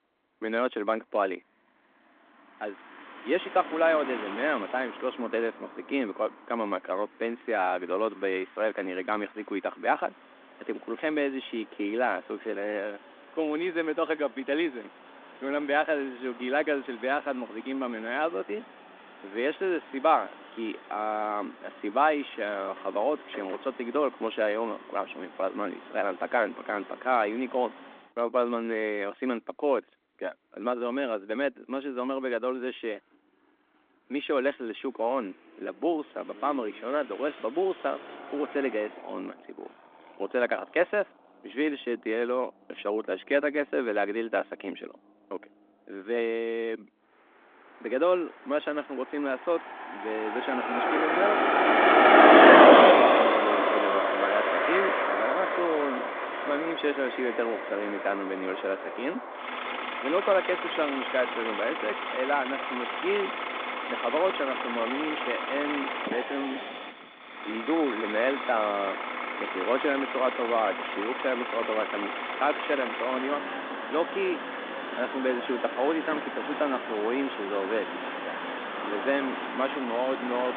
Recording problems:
phone-call audio; nothing above 3.5 kHz
traffic noise; very loud; throughout; 4 dB above the speech

